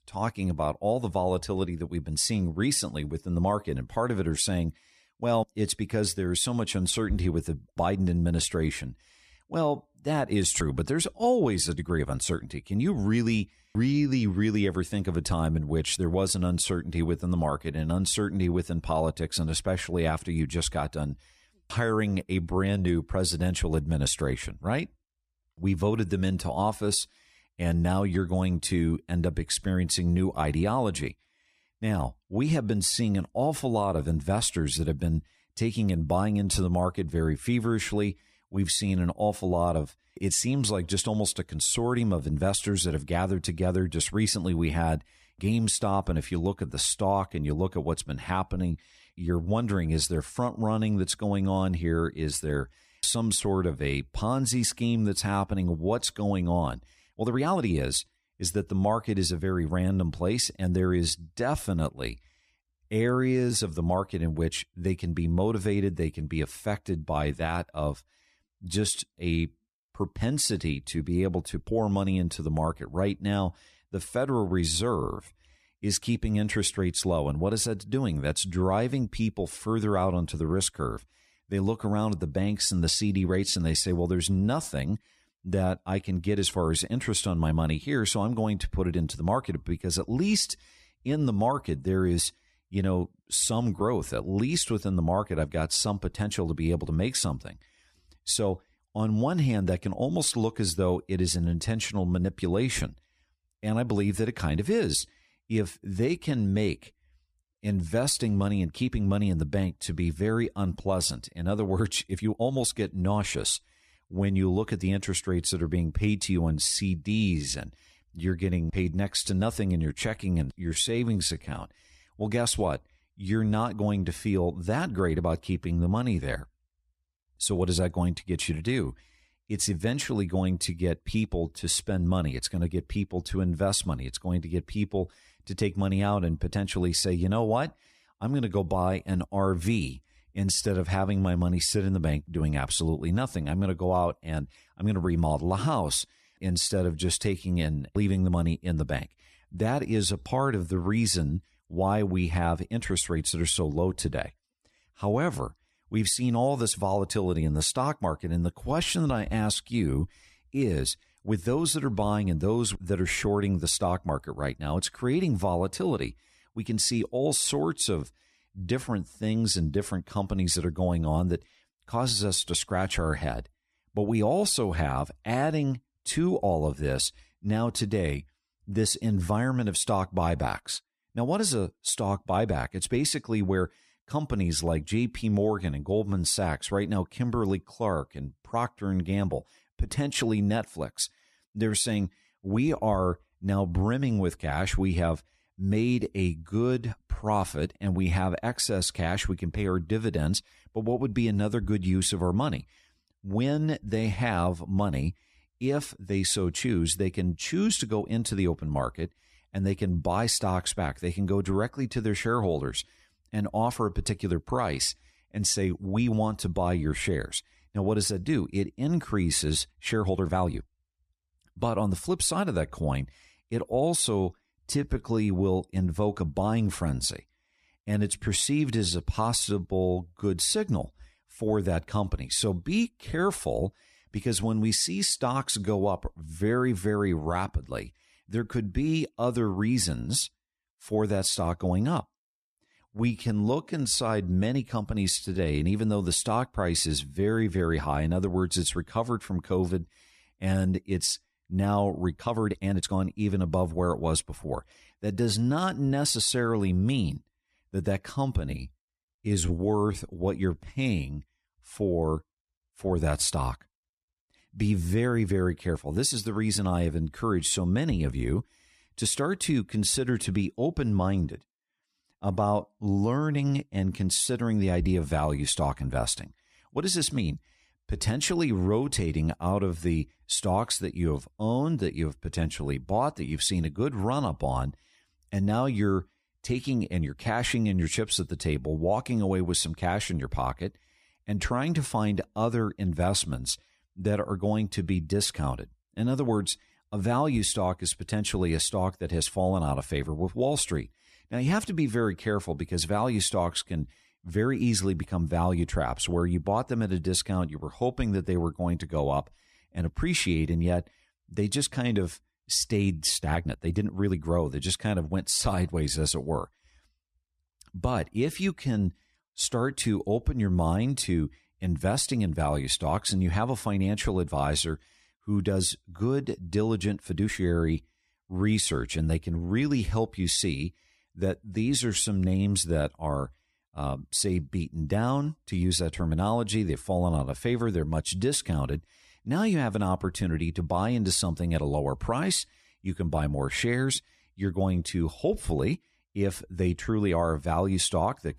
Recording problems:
uneven, jittery; strongly; from 12 s to 5:36

